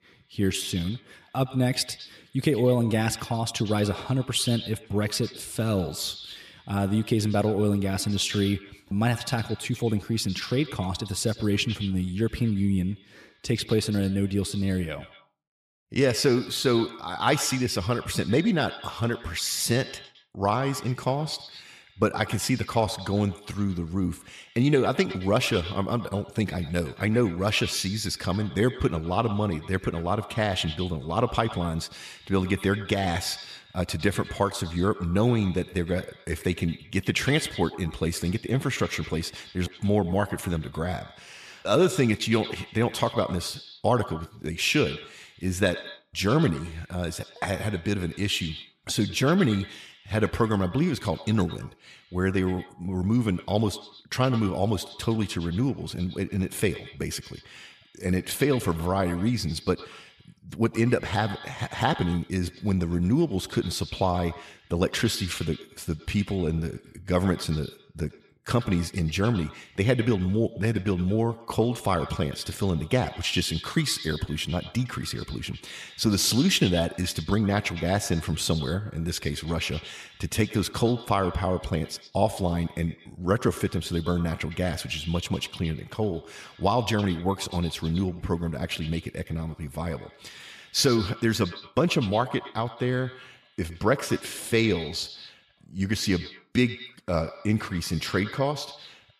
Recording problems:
echo of what is said; noticeable; throughout; 110 ms later, 15 dB below the speech

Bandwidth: 14.5 kHz